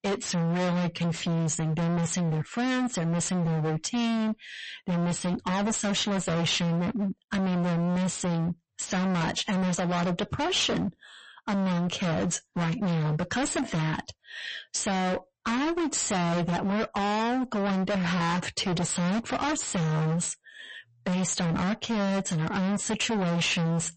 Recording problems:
distortion; heavy; 46% of the sound clipped
garbled, watery; slightly; nothing above 8 kHz

